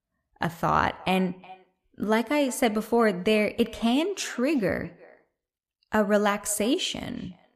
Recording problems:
echo of what is said; faint; throughout; 360 ms later, 25 dB below the speech

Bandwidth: 14.5 kHz